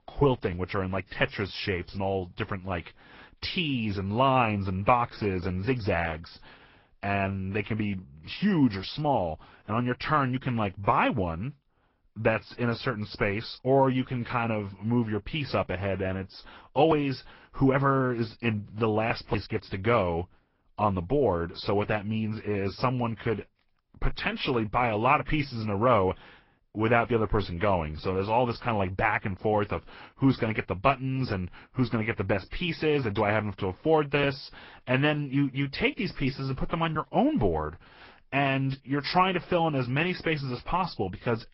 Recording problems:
high frequencies cut off; noticeable; nothing above 5.5 kHz
garbled, watery; slightly

